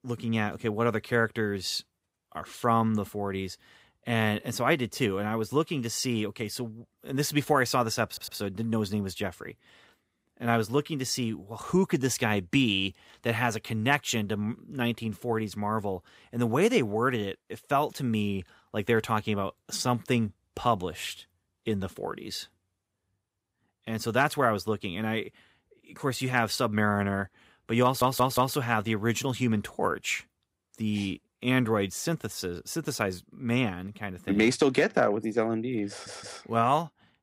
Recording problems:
audio stuttering; at 8 s, at 28 s and at 36 s

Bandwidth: 15.5 kHz